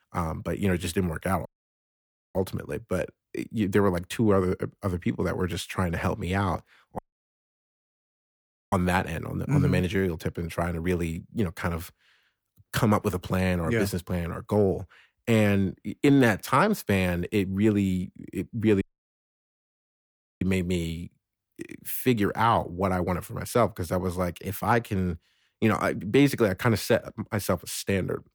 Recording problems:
audio cutting out; at 1.5 s for 1 s, at 7 s for 1.5 s and at 19 s for 1.5 s

